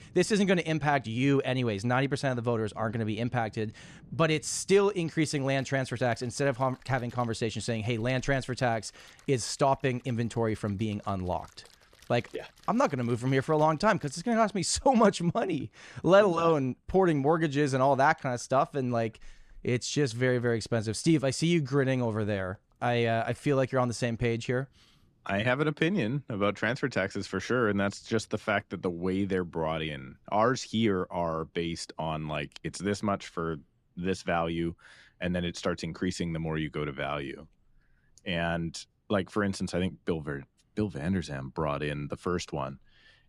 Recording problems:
rain or running water; faint; until 31 s; 30 dB below the speech

